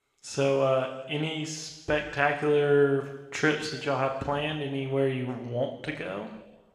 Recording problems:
room echo; noticeable; dies away in 1.1 s
off-mic speech; somewhat distant

